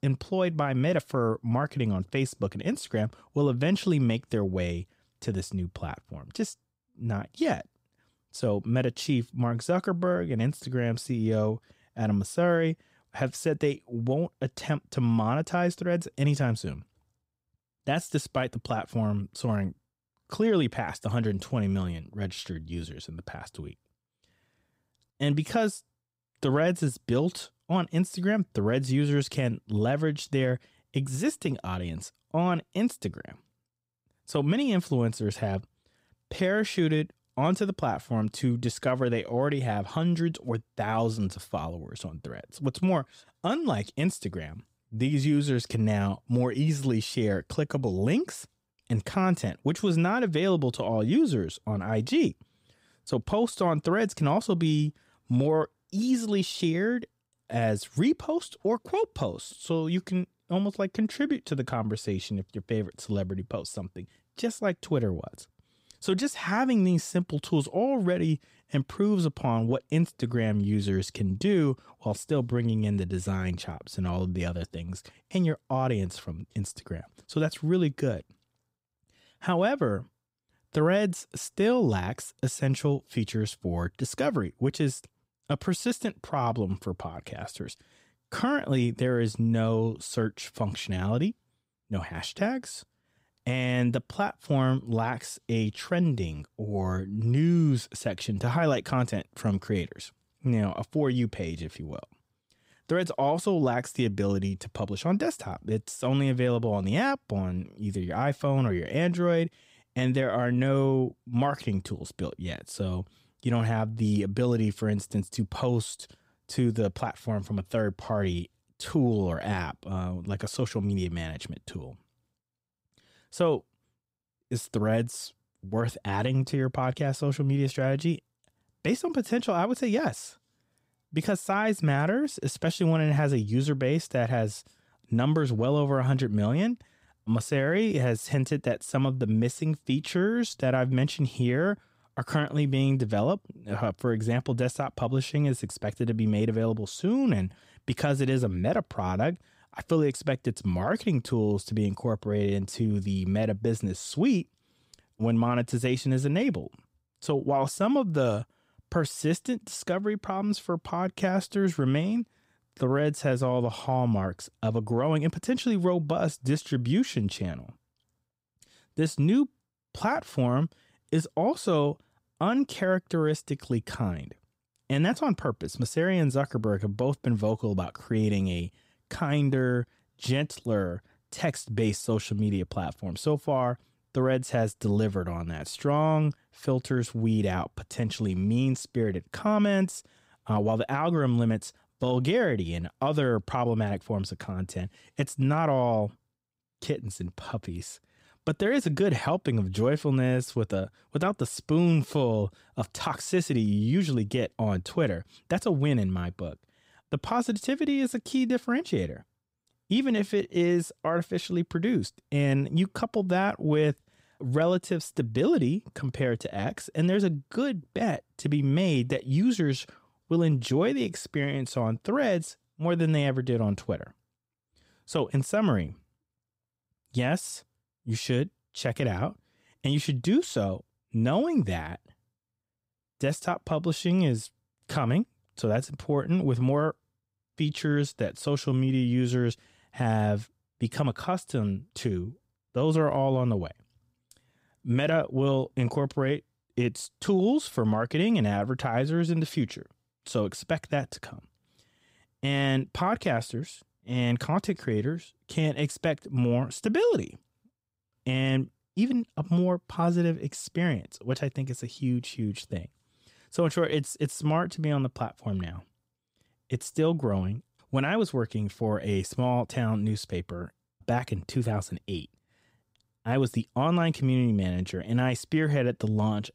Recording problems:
none

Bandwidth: 15.5 kHz